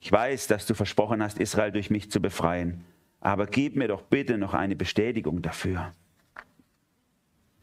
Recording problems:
squashed, flat; somewhat

